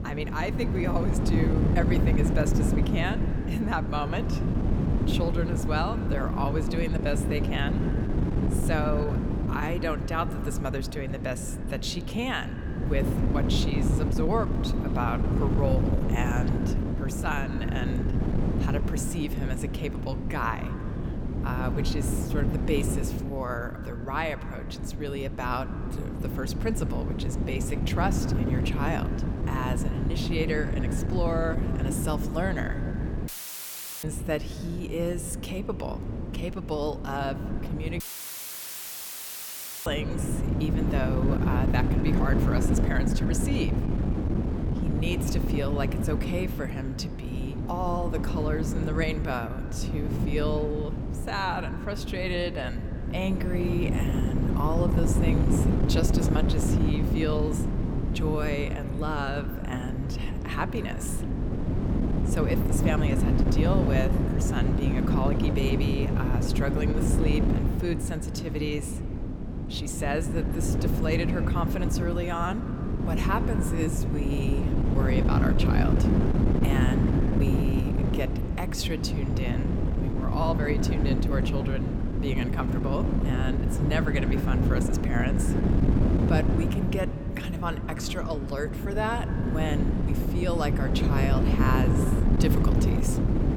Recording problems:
echo of what is said; noticeable; throughout; 90 ms later, 20 dB below the speech
wind noise on the microphone; heavy; 2 dB below the speech
audio cutting out; filled with static; at 33 s for 1 s and at 38 s for 2 s

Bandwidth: 18.5 kHz